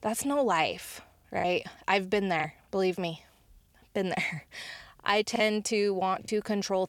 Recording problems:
choppy; occasionally; 4% of the speech affected

